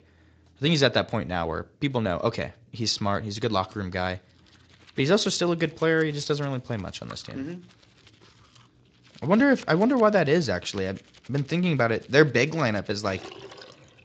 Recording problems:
garbled, watery; slightly; nothing above 7.5 kHz
household noises; faint; from 4.5 s on; 25 dB below the speech

